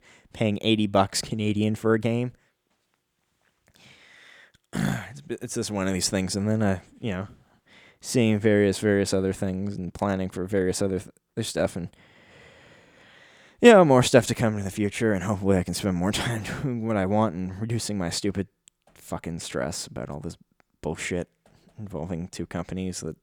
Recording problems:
none

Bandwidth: 19 kHz